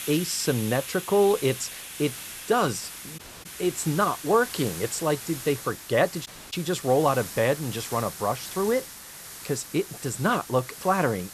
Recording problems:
hiss; noticeable; throughout; 10 dB below the speech
audio cutting out; at 3 s and at 6.5 s

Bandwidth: 13.5 kHz